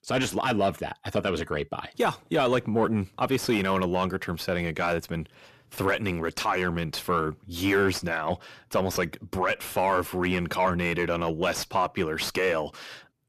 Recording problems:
distortion; slight; 10 dB below the speech

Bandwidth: 14.5 kHz